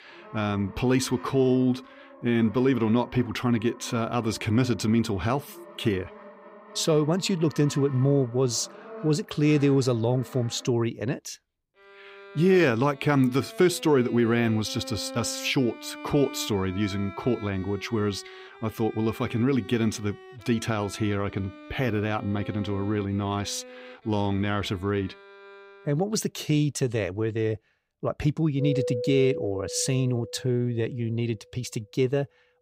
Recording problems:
background music; noticeable; throughout; 15 dB below the speech

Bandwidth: 15.5 kHz